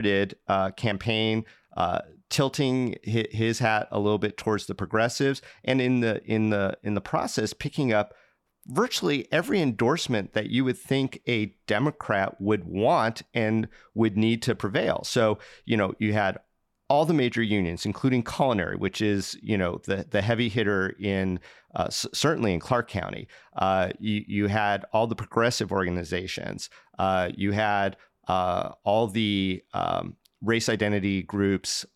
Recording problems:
abrupt cut into speech; at the start

